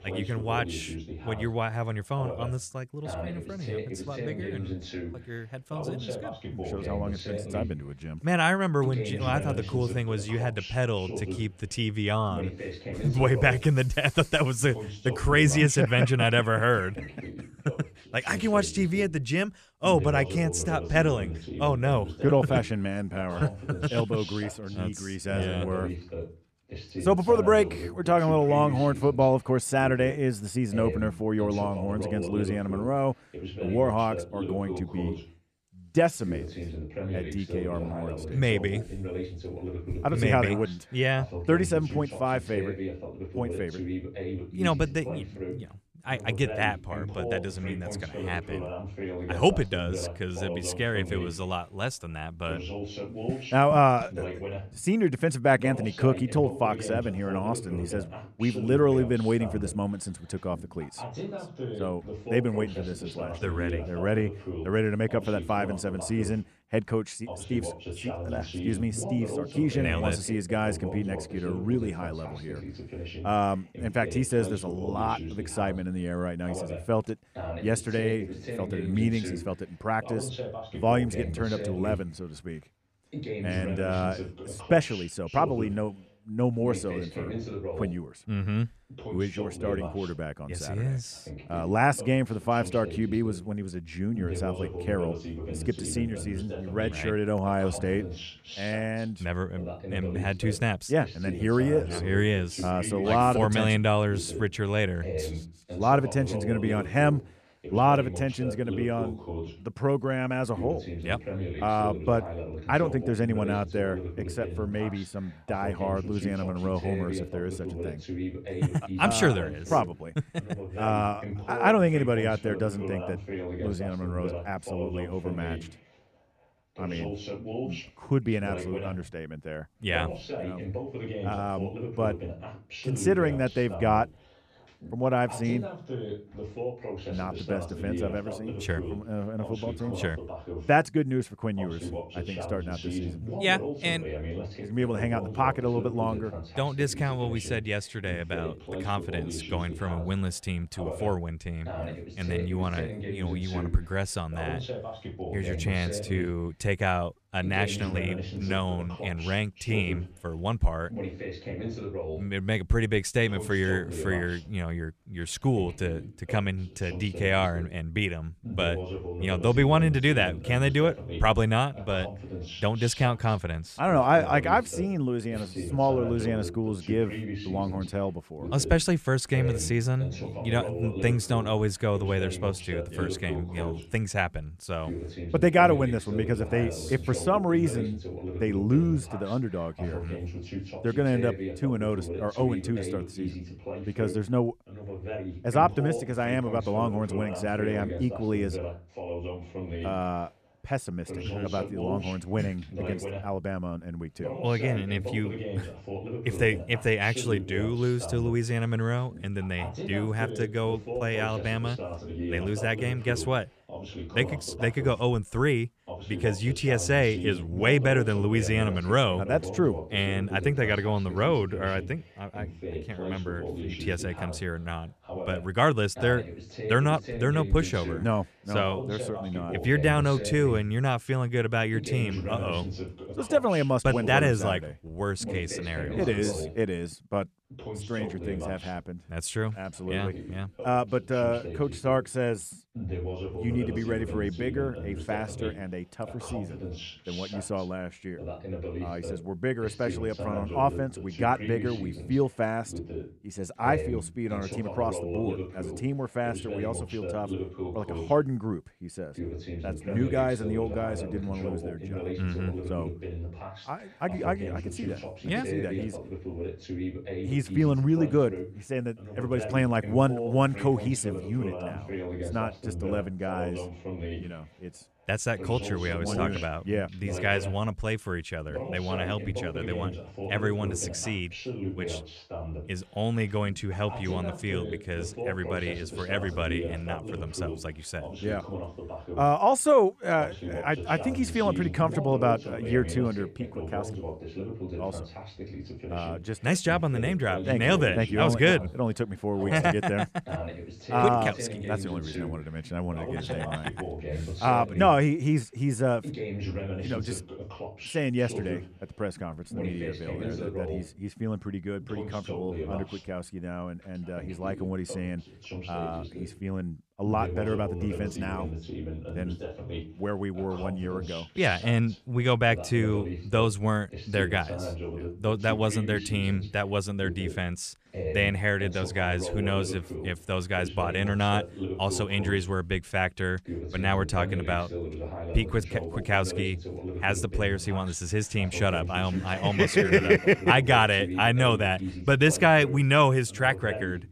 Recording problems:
voice in the background; loud; throughout; 9 dB below the speech

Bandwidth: 14.5 kHz